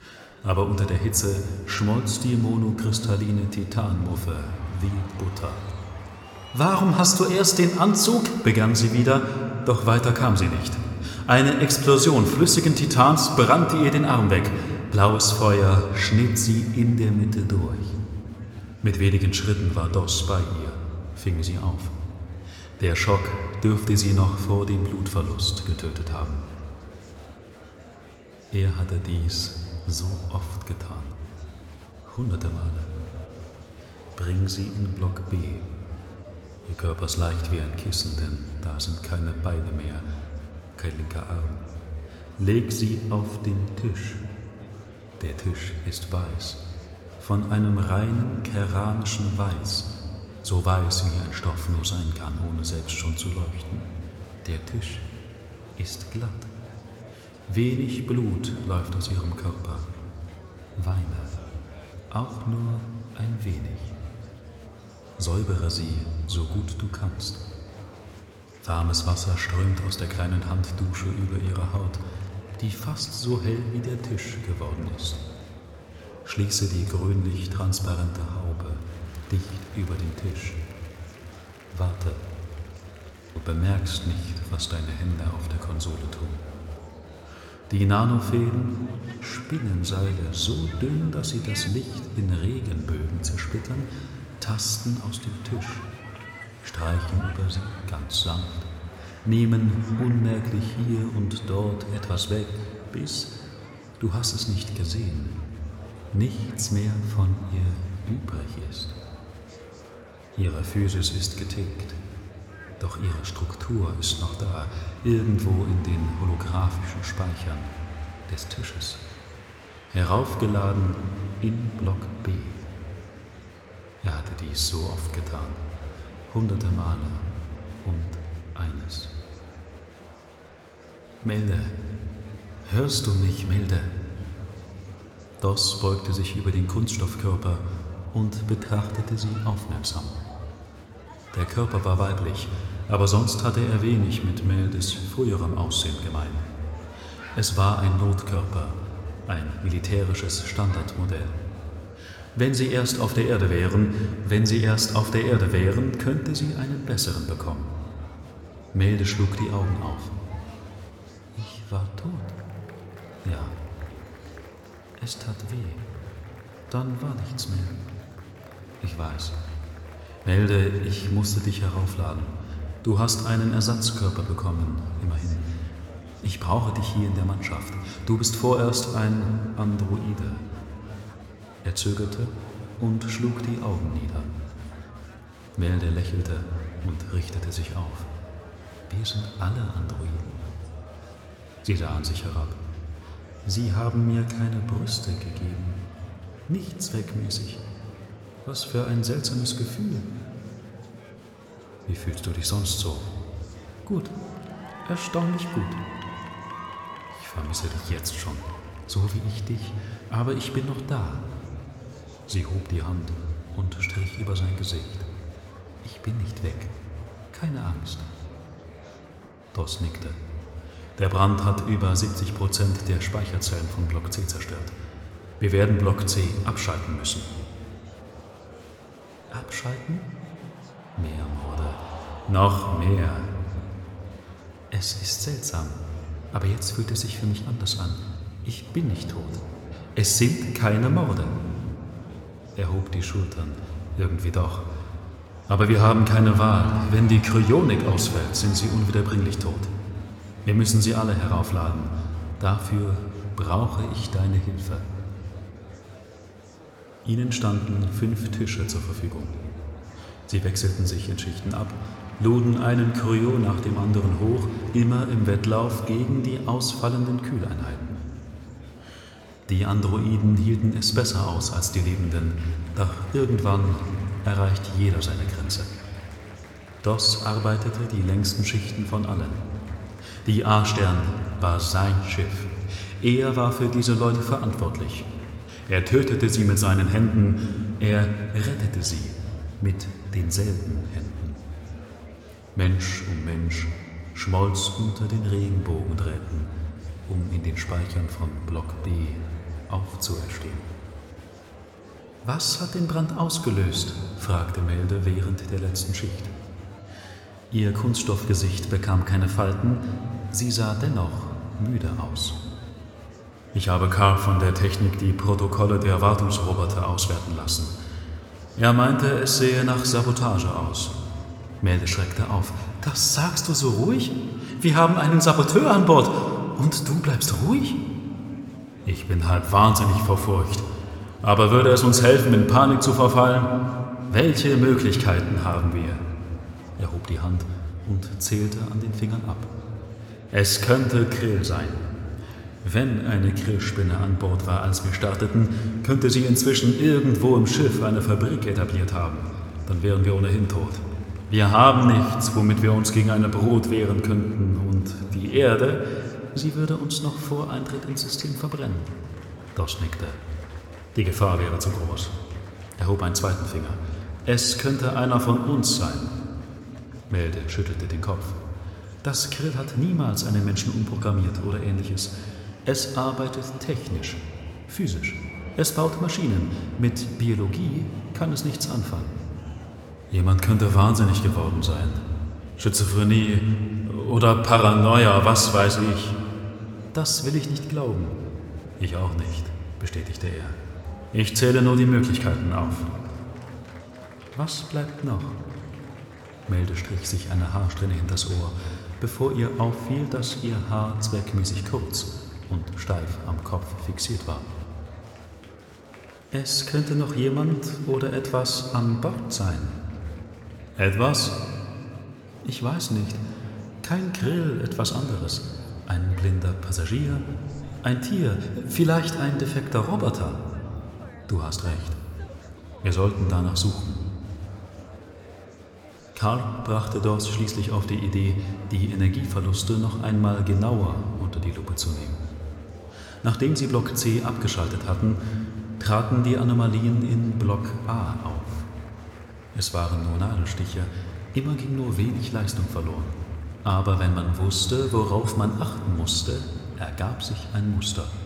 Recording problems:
room echo; slight; dies away in 2 s
murmuring crowd; faint; throughout; 20 dB below the speech

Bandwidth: 17 kHz